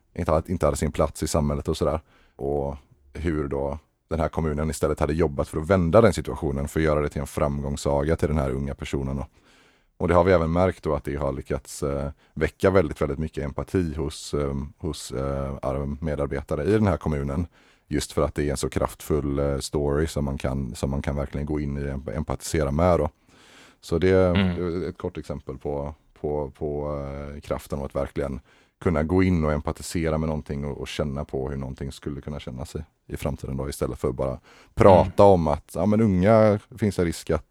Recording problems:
none

